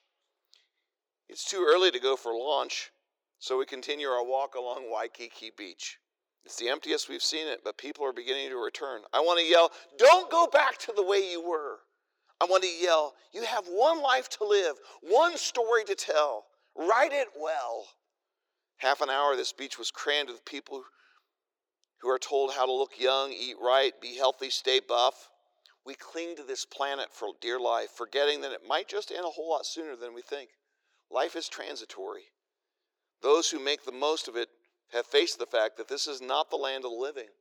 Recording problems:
thin; very; fading below 350 Hz

